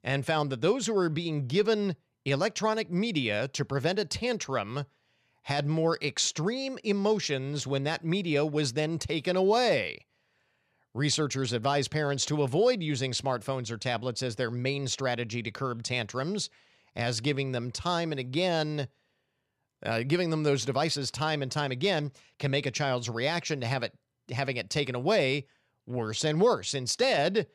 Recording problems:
none

